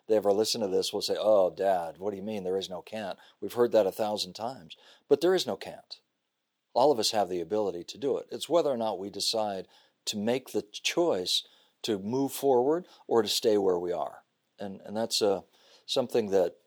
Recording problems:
thin; somewhat; fading below 450 Hz

